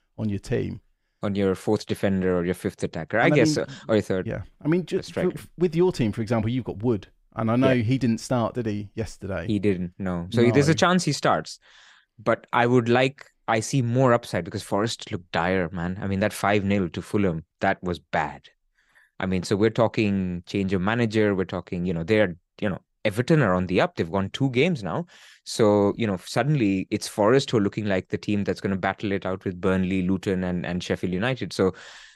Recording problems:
none

